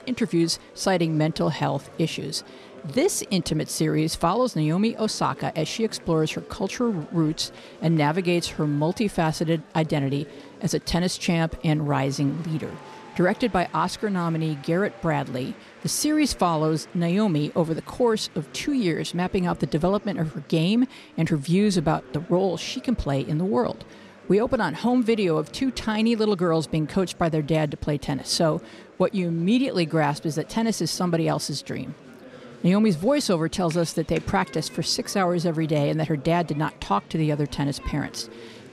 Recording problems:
murmuring crowd; faint; throughout; 20 dB below the speech

